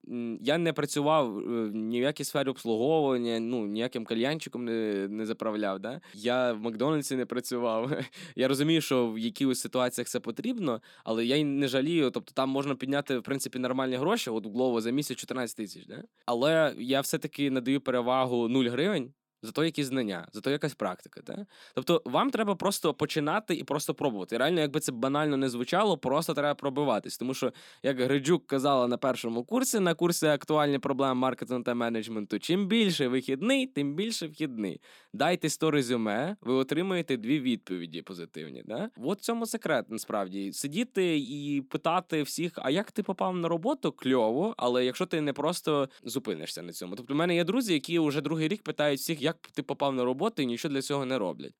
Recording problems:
none

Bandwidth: 17.5 kHz